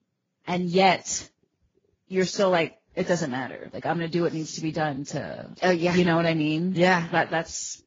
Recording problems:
garbled, watery; badly
high frequencies cut off; noticeable; nothing above 7 kHz

